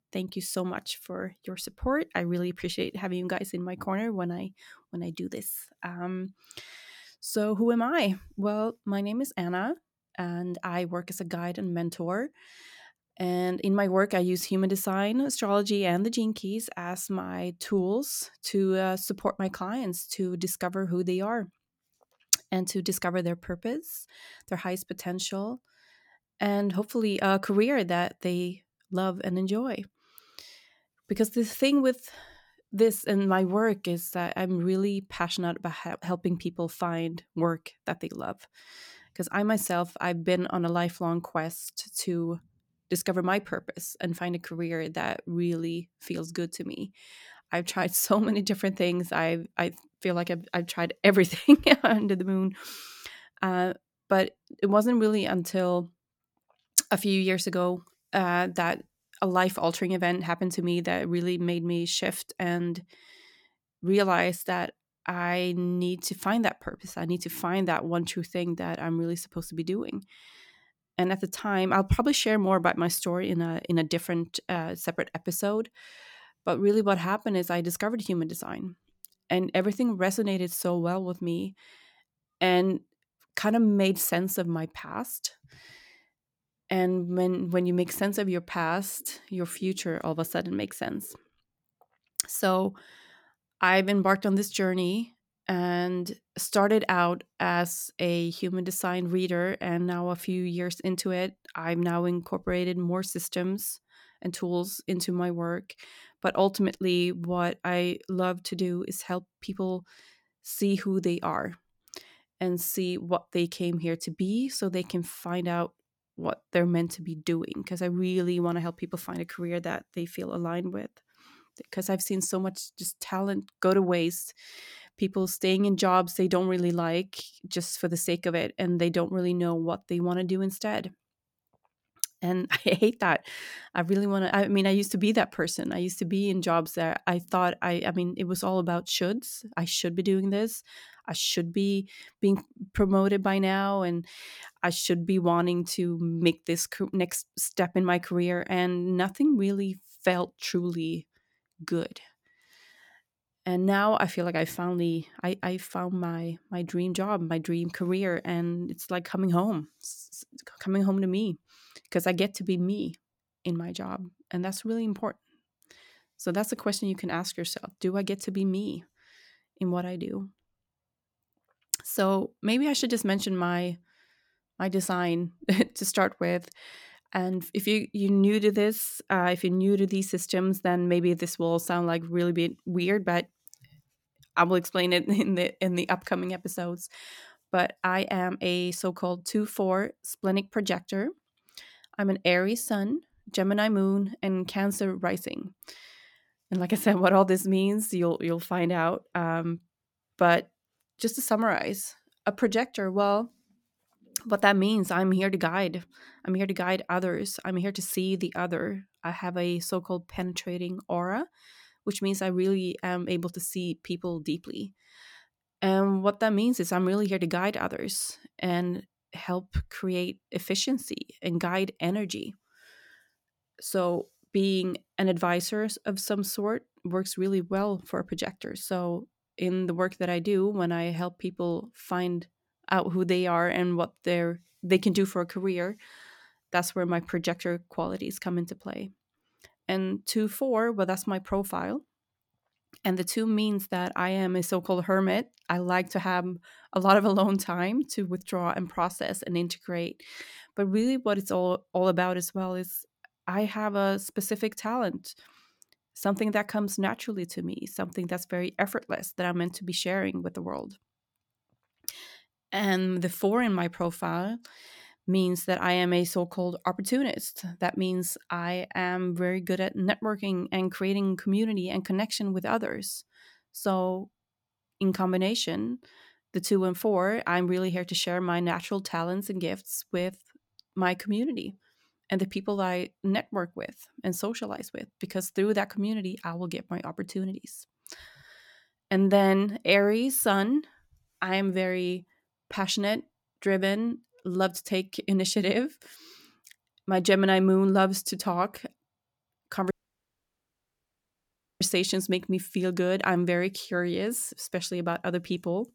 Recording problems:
audio cutting out; at 5:00 for 2 s

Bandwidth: 18 kHz